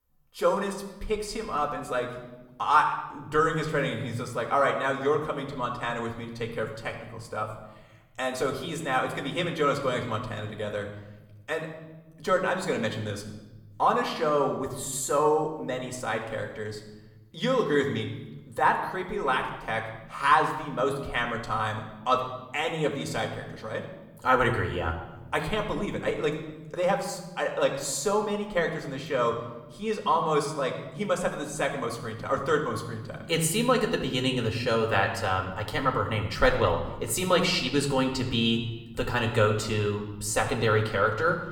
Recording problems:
room echo; slight; dies away in 1.1 s
off-mic speech; somewhat distant

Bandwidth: 17.5 kHz